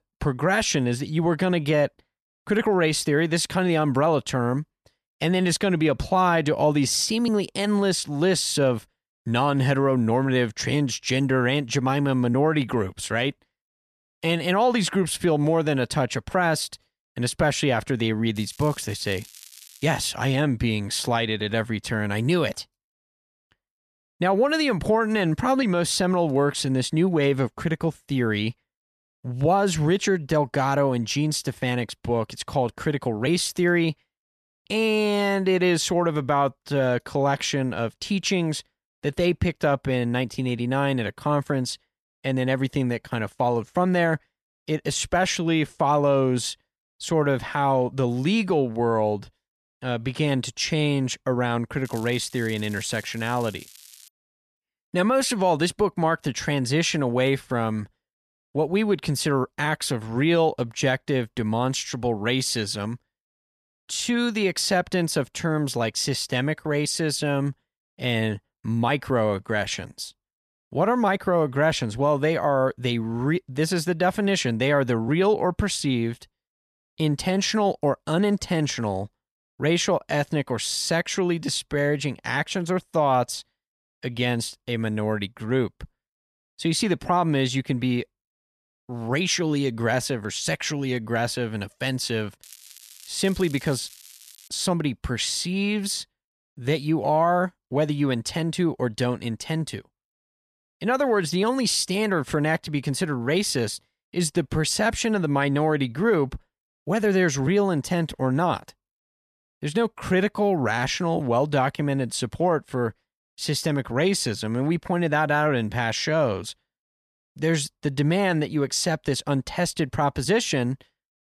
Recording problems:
crackling; faint; from 18 to 20 s, from 52 to 54 s and from 1:32 to 1:34; 20 dB below the speech

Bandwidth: 13.5 kHz